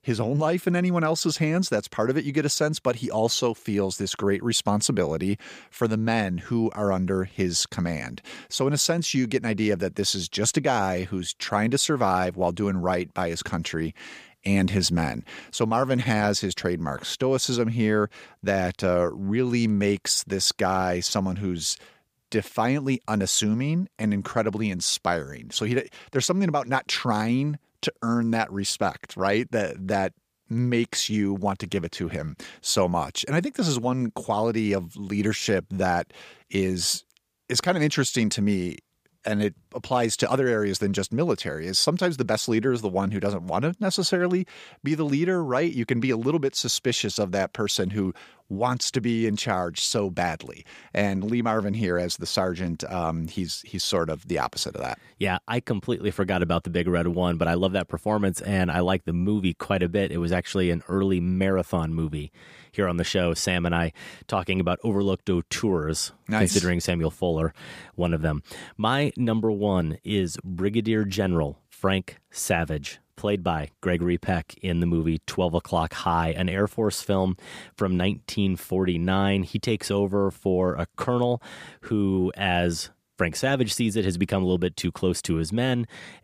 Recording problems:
none

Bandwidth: 15 kHz